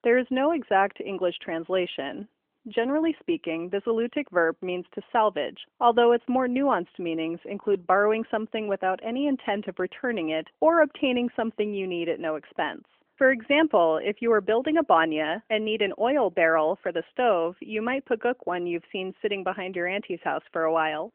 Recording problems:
phone-call audio; nothing above 3 kHz

